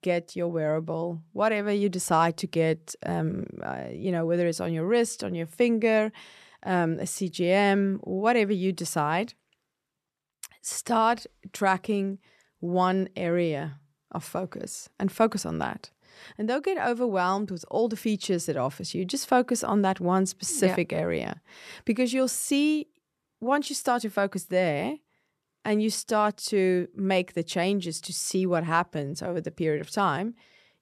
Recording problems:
none

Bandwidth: 13.5 kHz